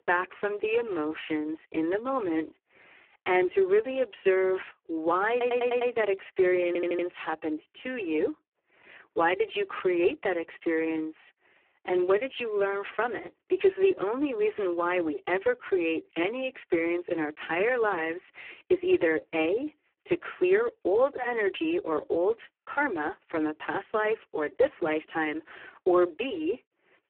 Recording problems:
phone-call audio; poor line
audio stuttering; at 5.5 s and at 6.5 s

